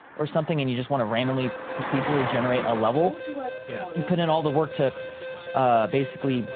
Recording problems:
phone-call audio
traffic noise; loud; throughout; 9 dB below the speech
alarm; faint; from 1 s on; peak 10 dB below the speech

